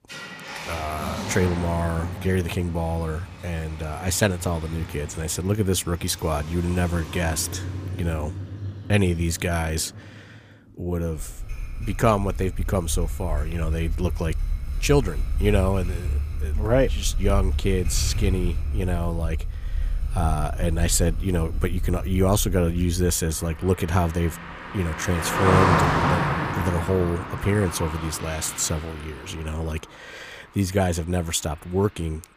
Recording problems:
traffic noise; loud; throughout; 4 dB below the speech

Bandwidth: 15 kHz